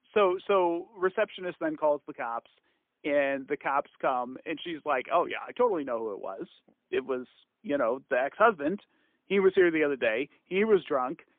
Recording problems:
phone-call audio; poor line; nothing above 3.5 kHz

